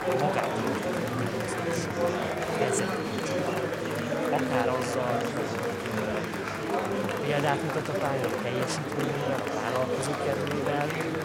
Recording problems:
murmuring crowd; very loud; throughout; 4 dB above the speech

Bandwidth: 16 kHz